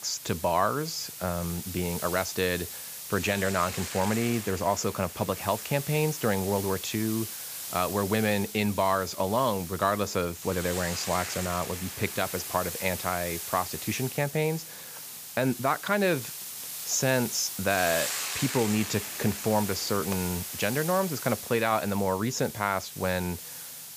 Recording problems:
high frequencies cut off; noticeable; nothing above 8 kHz
hiss; loud; throughout; 7 dB below the speech

